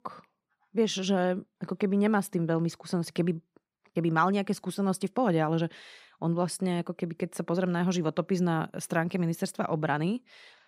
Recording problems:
none

